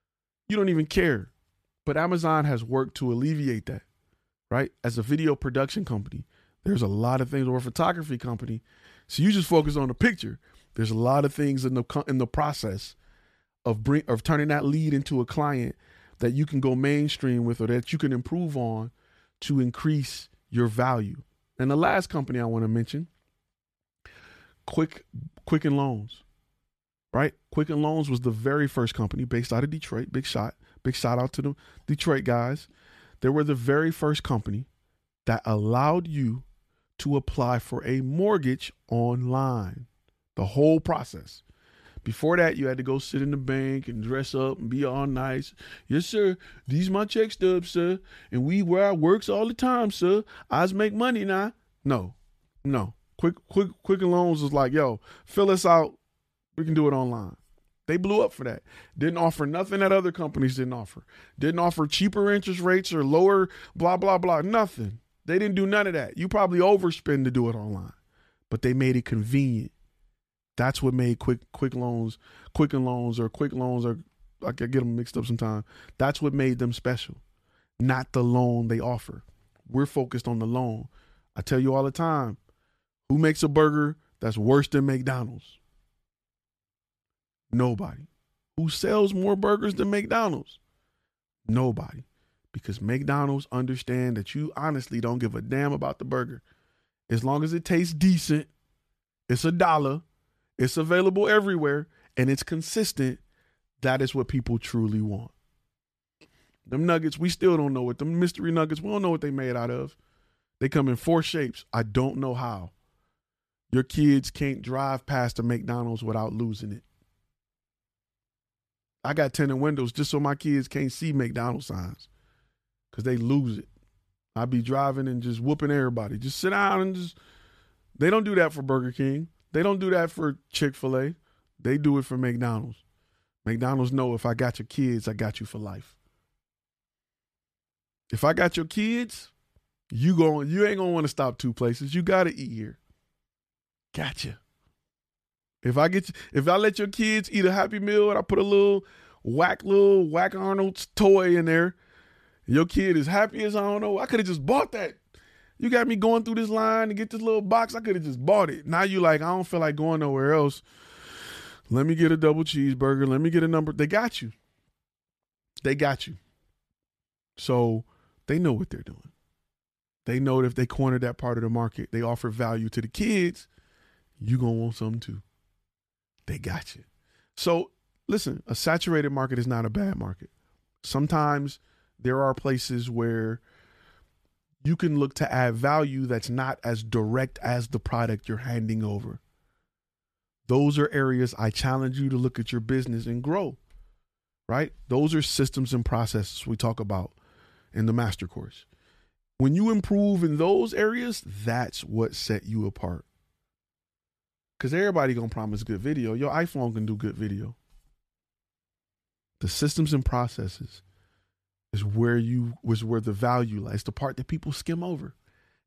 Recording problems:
none

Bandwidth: 14.5 kHz